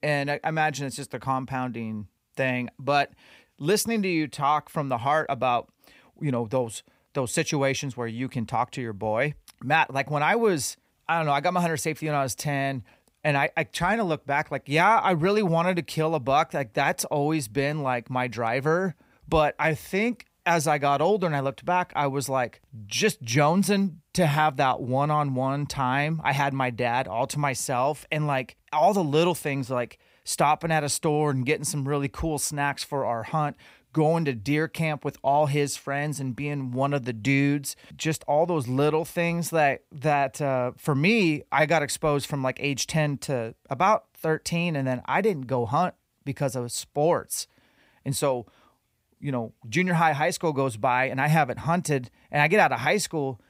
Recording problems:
none

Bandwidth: 15.5 kHz